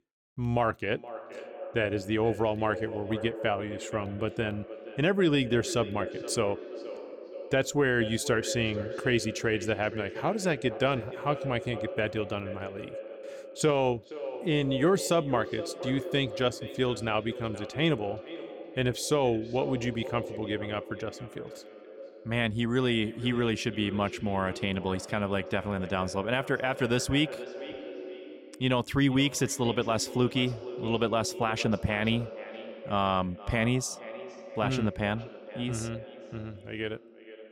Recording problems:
echo of what is said; strong; throughout; 470 ms later, 10 dB below the speech

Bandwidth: 17.5 kHz